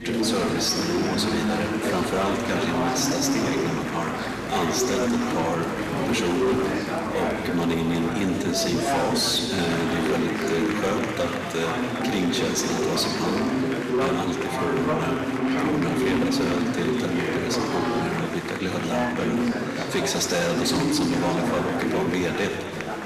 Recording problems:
room echo; noticeable; dies away in 1.8 s
distortion; slight; 14% of the sound clipped
off-mic speech; somewhat distant
chatter from many people; very loud; throughout; as loud as the speech

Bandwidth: 14.5 kHz